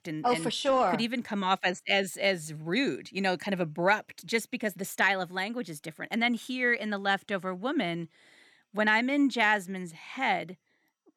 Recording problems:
none

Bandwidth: 18.5 kHz